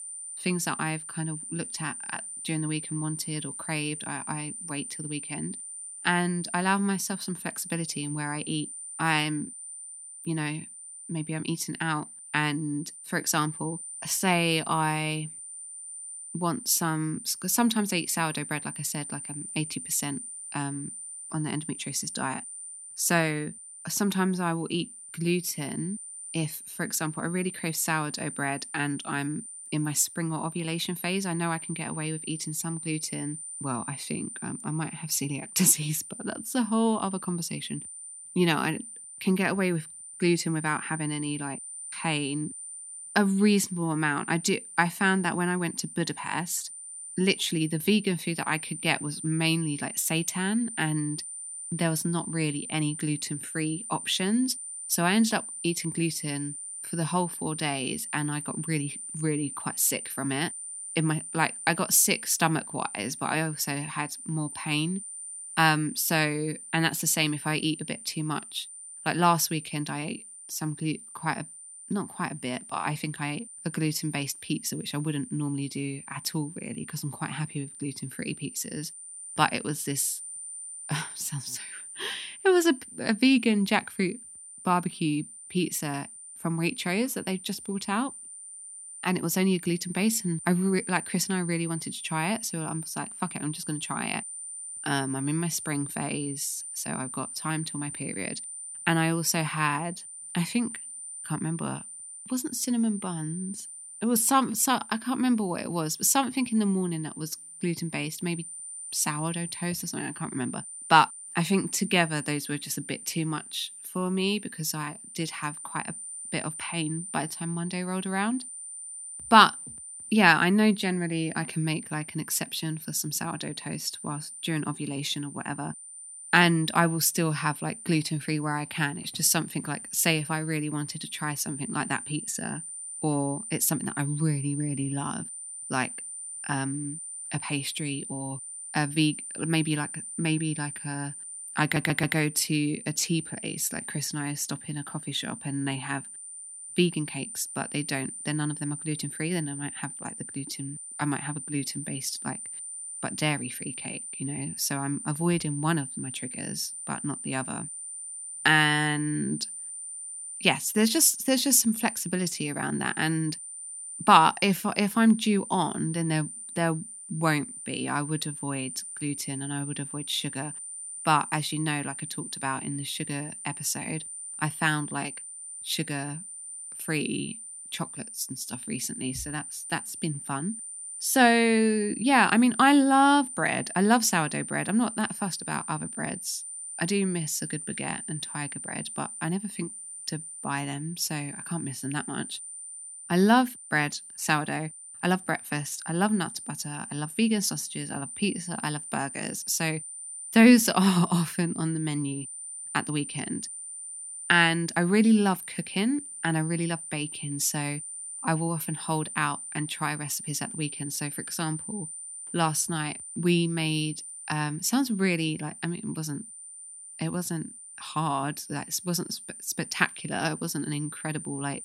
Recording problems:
high-pitched whine; loud; throughout; 9 kHz, 10 dB below the speech
audio stuttering; at 2:22

